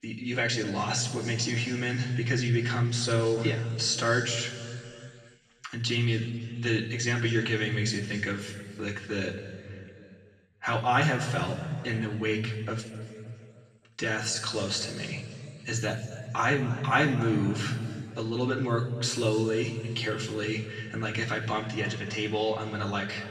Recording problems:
off-mic speech; far
room echo; noticeable; dies away in 2.1 s

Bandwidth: 14.5 kHz